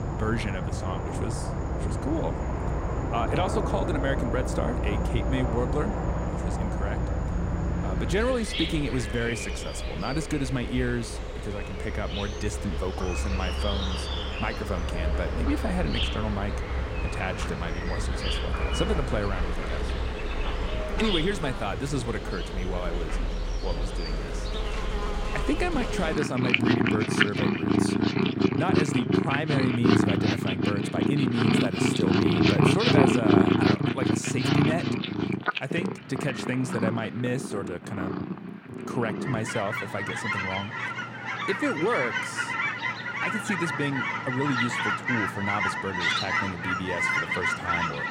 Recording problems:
animal sounds; very loud; throughout; 3 dB above the speech

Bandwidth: 16 kHz